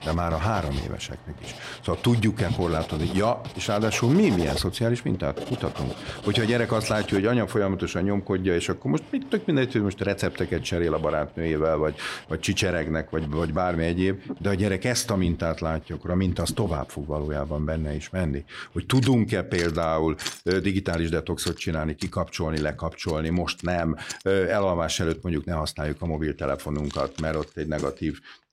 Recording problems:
household noises; noticeable; throughout; 15 dB below the speech

